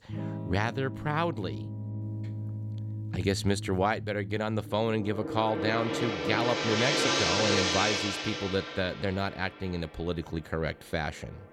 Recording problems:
background music; loud; throughout; 1 dB below the speech

